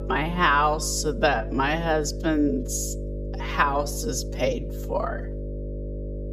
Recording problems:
wrong speed, natural pitch; too slow; 0.6 times normal speed
electrical hum; noticeable; throughout; 50 Hz, 15 dB below the speech

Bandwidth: 15 kHz